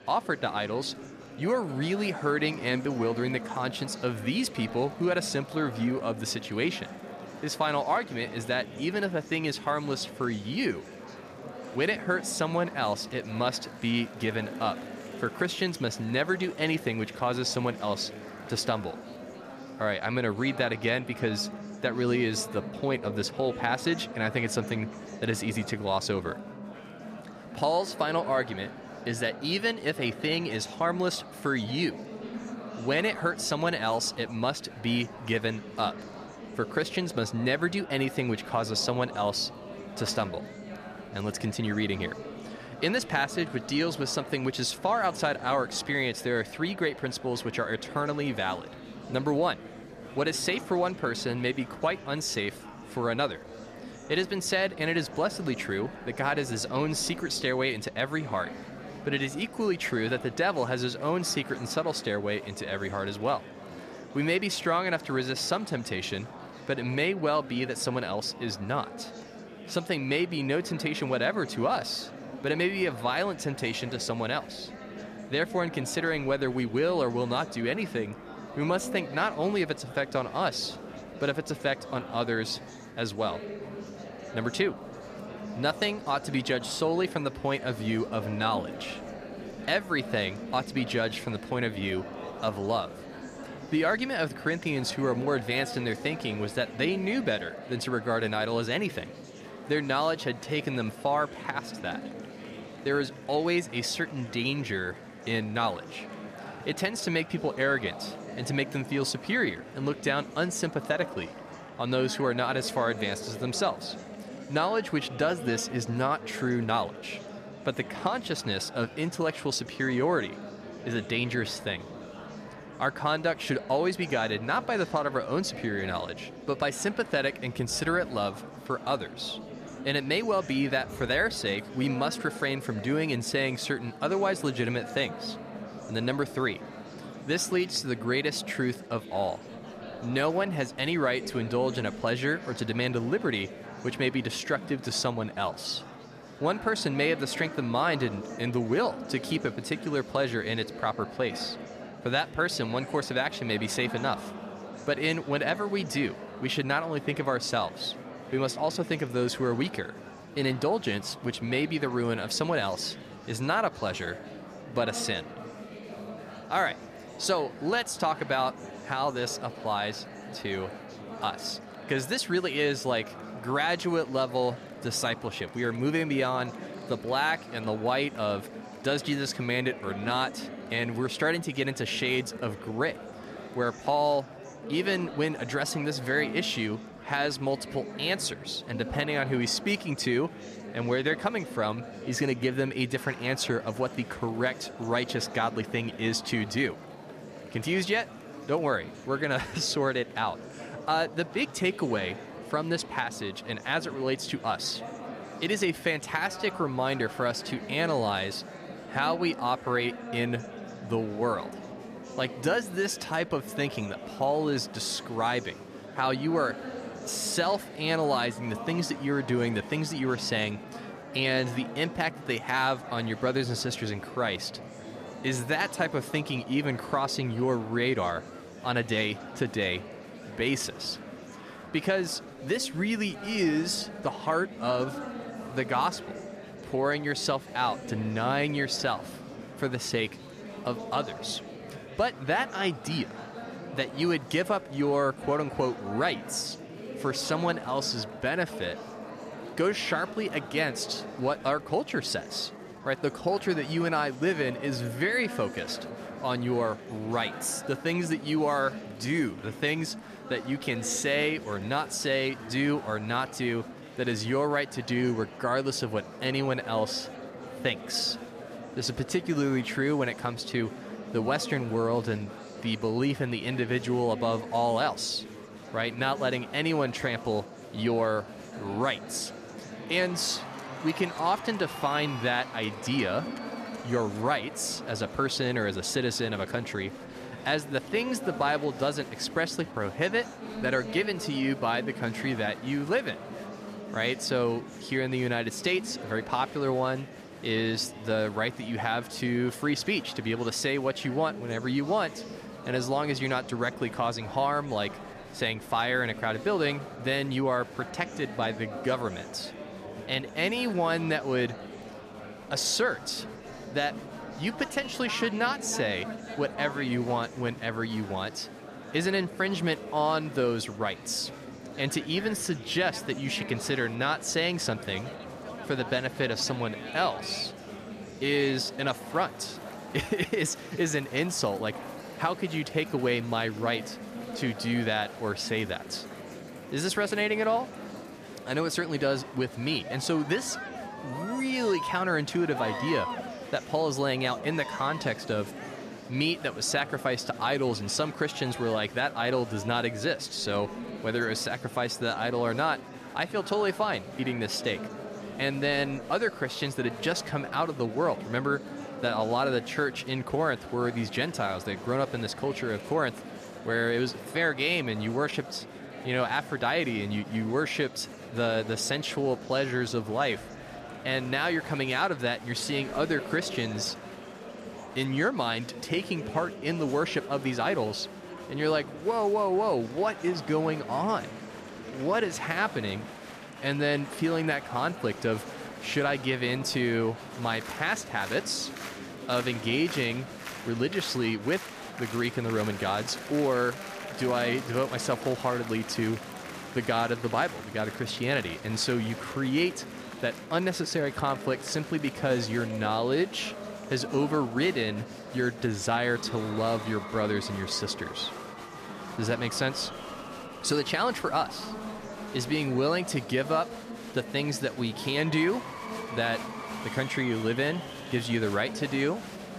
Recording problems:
murmuring crowd; noticeable; throughout; 10 dB below the speech

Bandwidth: 14.5 kHz